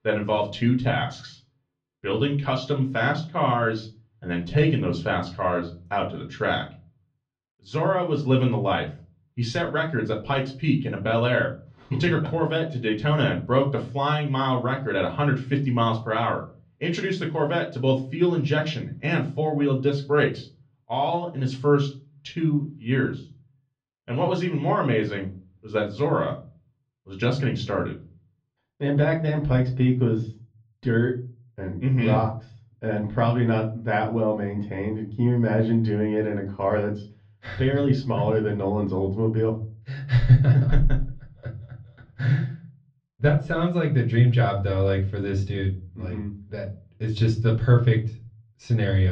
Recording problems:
off-mic speech; far
muffled; slightly; fading above 4 kHz
room echo; very slight; dies away in 0.3 s
abrupt cut into speech; at the end

